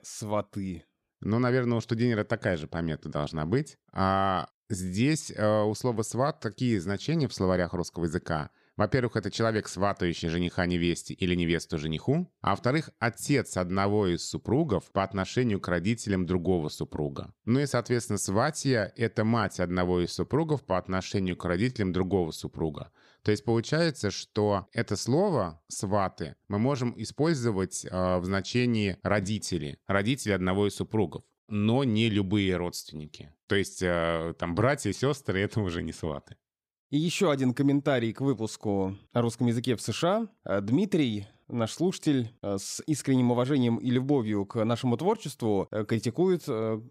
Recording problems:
none

